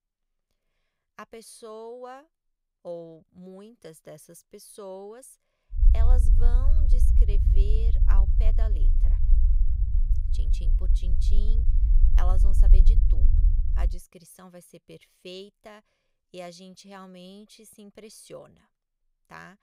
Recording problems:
low rumble; loud; from 6 to 14 s; 3 dB below the speech

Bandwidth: 15.5 kHz